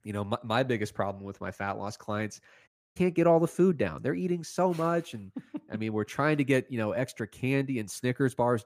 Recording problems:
audio cutting out; at 2.5 s

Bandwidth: 15 kHz